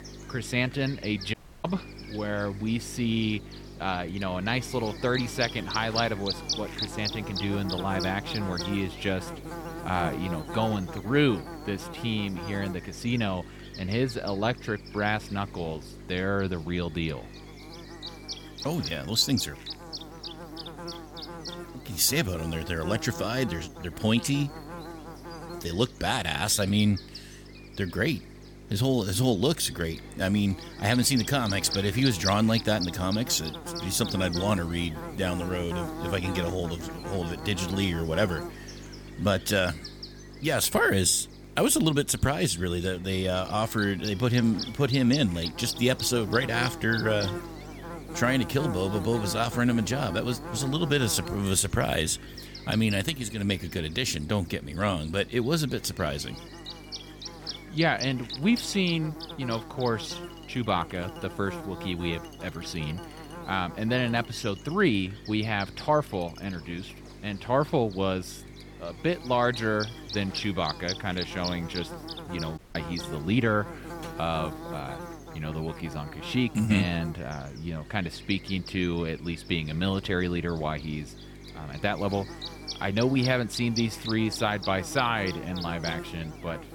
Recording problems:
electrical hum; loud; throughout; 50 Hz, 9 dB below the speech
household noises; faint; throughout; 30 dB below the speech
audio cutting out; at 1.5 s and at 1:13

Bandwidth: 18.5 kHz